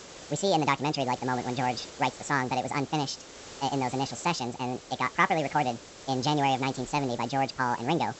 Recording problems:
wrong speed and pitch; too fast and too high; 1.6 times normal speed
high frequencies cut off; noticeable; nothing above 8 kHz
hiss; noticeable; throughout; 15 dB below the speech

